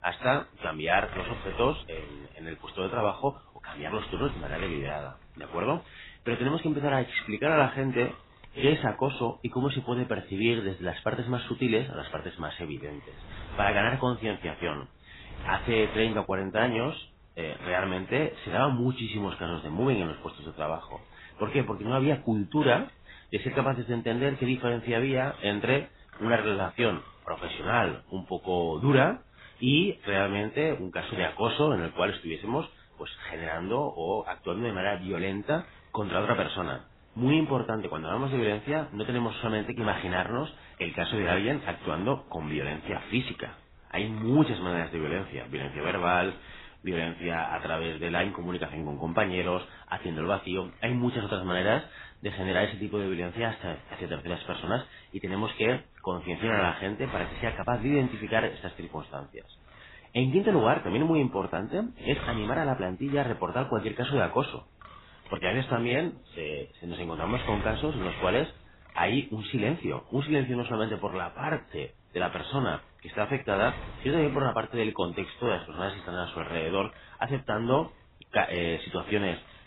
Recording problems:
garbled, watery; badly; nothing above 4 kHz
wind noise on the microphone; occasional gusts; 20 dB below the speech

